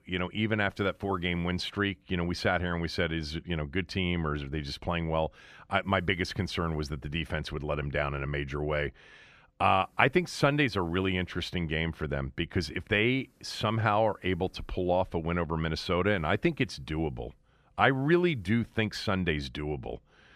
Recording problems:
none

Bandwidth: 14.5 kHz